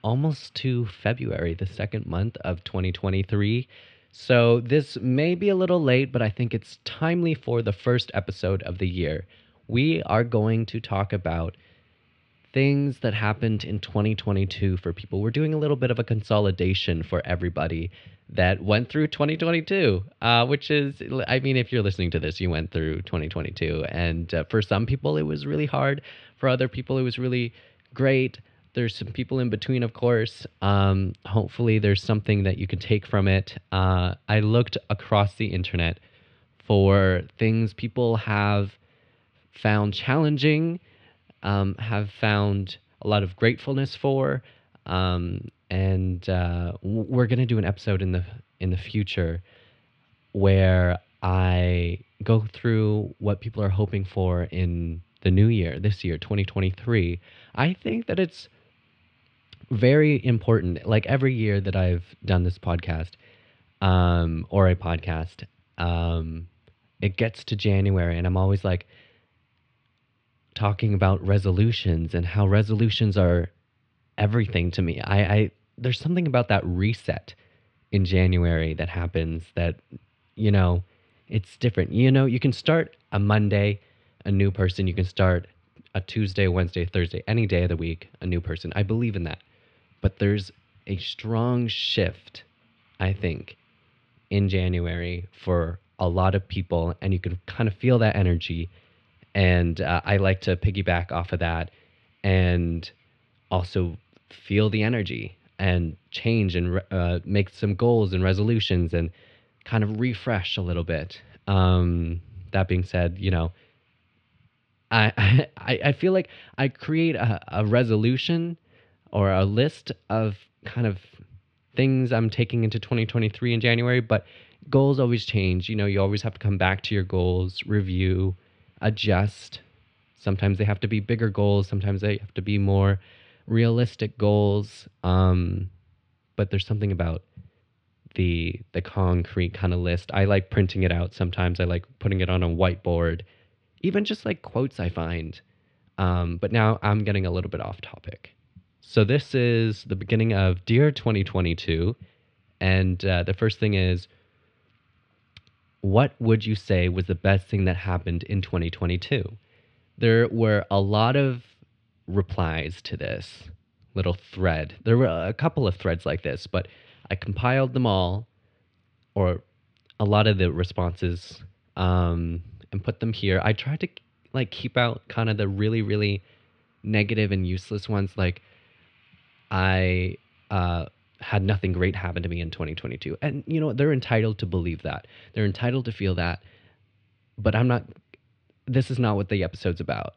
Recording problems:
muffled; very slightly; fading above 4 kHz

